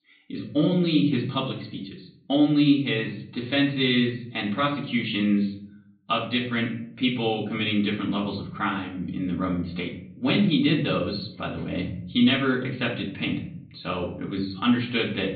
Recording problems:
off-mic speech; far
high frequencies cut off; severe; nothing above 4.5 kHz
room echo; slight; dies away in 0.5 s

